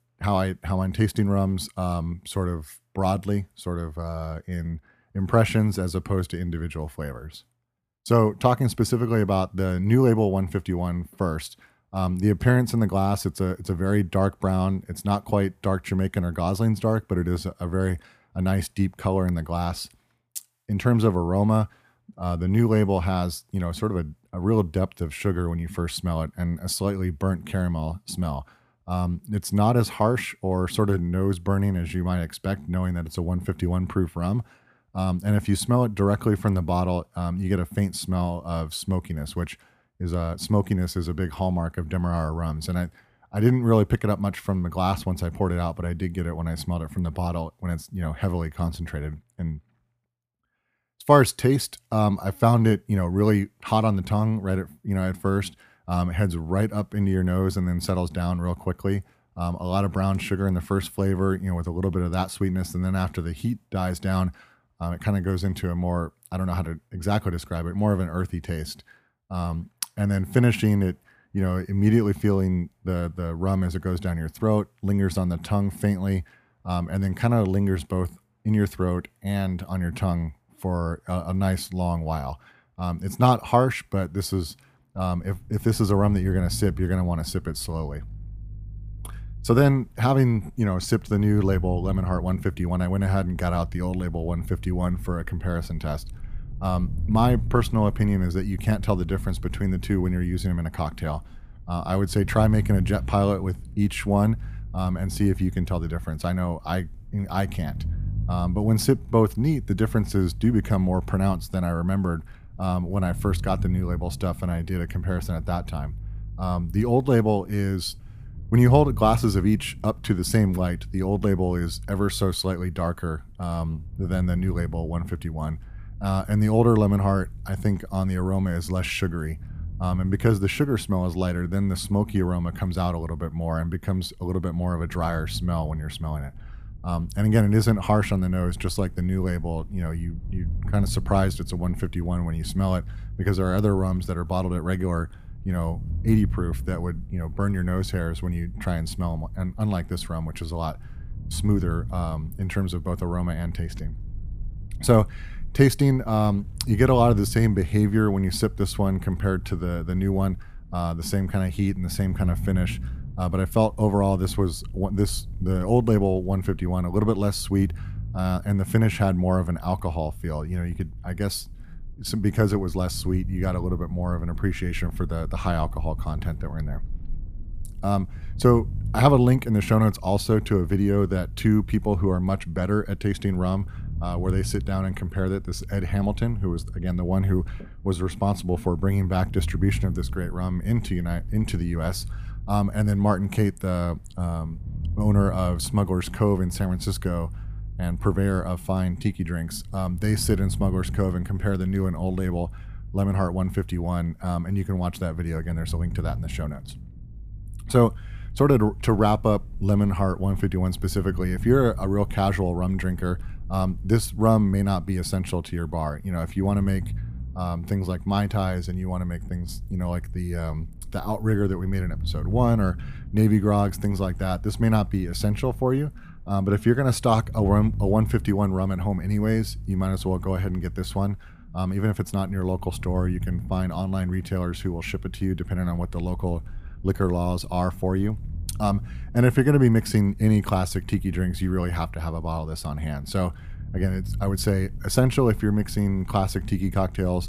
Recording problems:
low rumble; faint; from 1:25 on; 20 dB below the speech

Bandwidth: 15 kHz